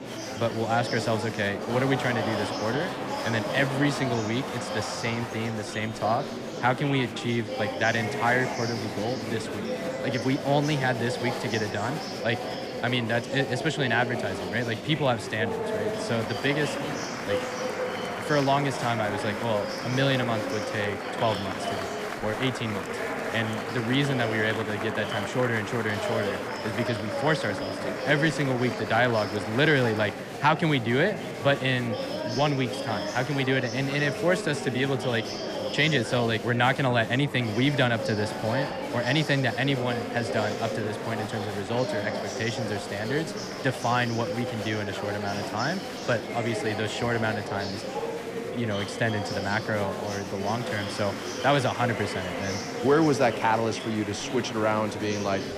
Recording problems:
murmuring crowd; loud; throughout; 5 dB below the speech

